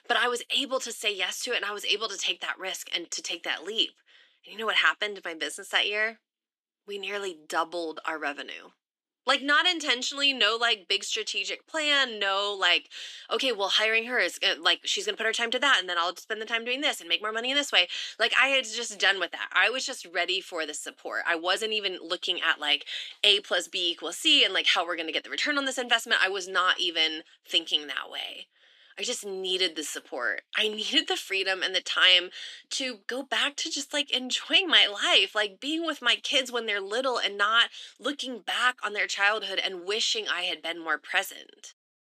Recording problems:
thin; somewhat; fading below 300 Hz

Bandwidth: 14 kHz